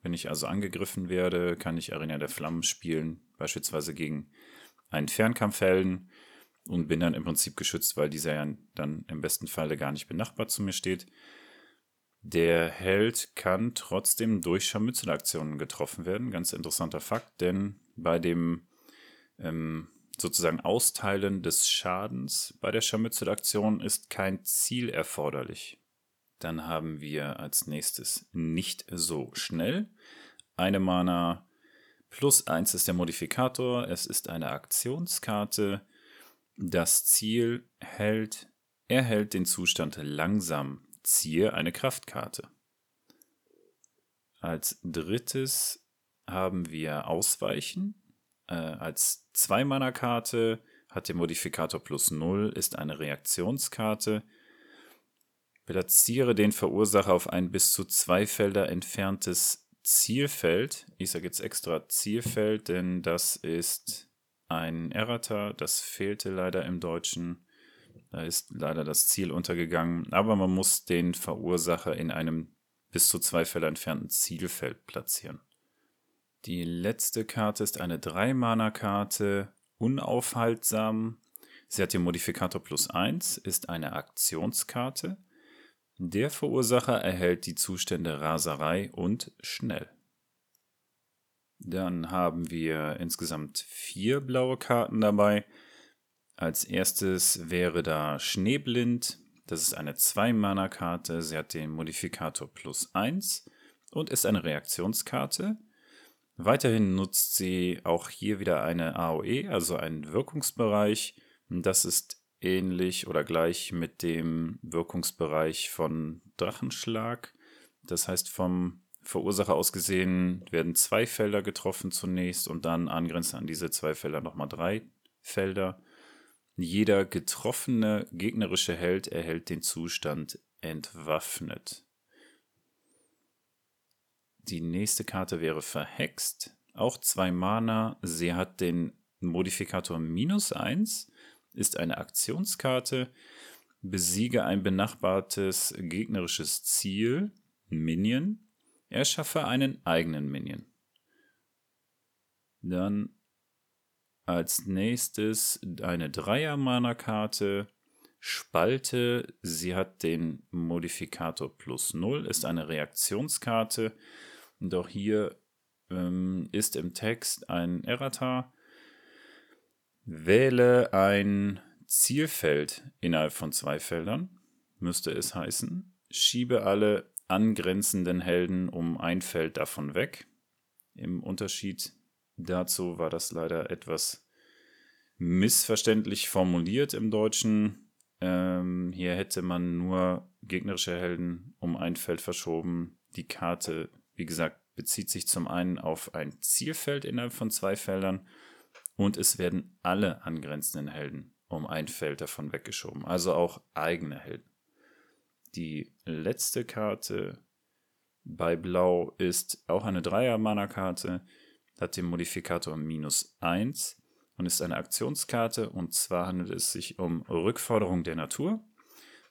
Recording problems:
none

